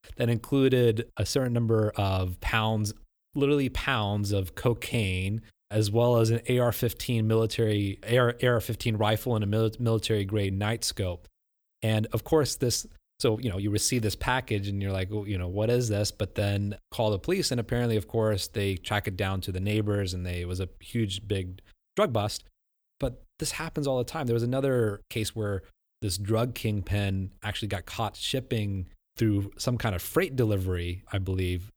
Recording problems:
uneven, jittery; strongly; from 1 to 30 s

